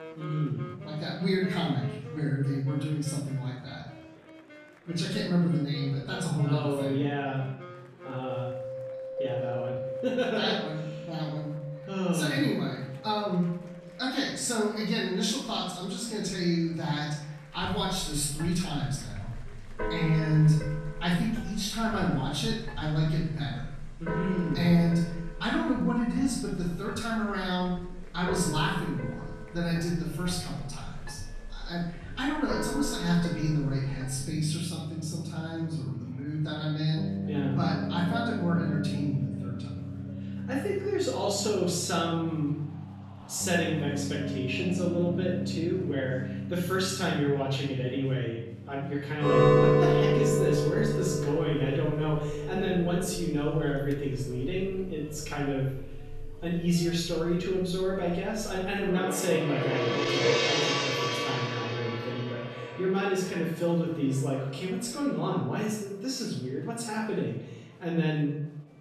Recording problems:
off-mic speech; far
room echo; noticeable; dies away in 0.7 s
background music; loud; throughout; 3 dB below the speech
murmuring crowd; faint; throughout; 25 dB below the speech

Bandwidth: 13.5 kHz